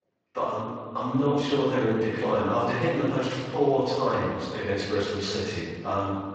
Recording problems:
room echo; strong; dies away in 1.7 s
off-mic speech; far
garbled, watery; slightly; nothing above 7.5 kHz

